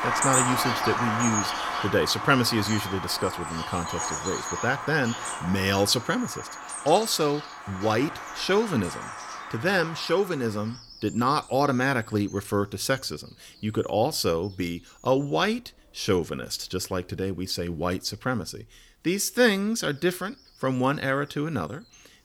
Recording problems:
animal sounds; loud; throughout; 4 dB below the speech

